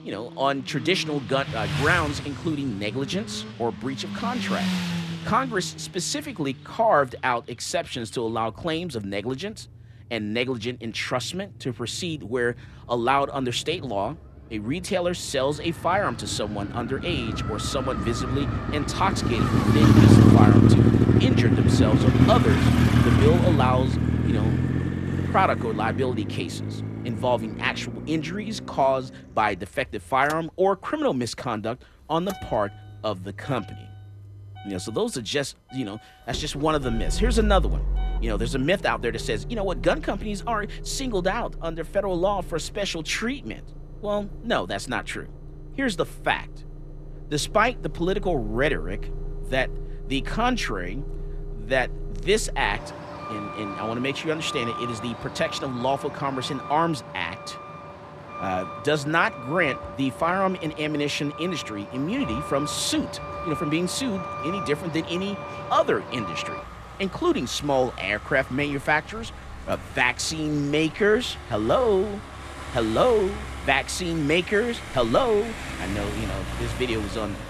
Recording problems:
traffic noise; loud; throughout; as loud as the speech

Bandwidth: 14 kHz